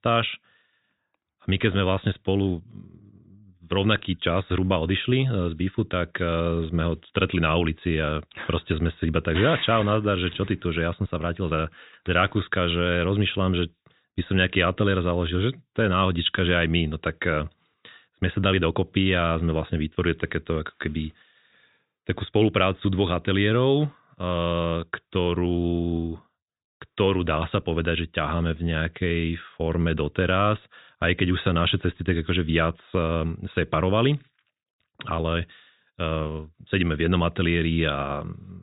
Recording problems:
high frequencies cut off; severe; nothing above 4 kHz

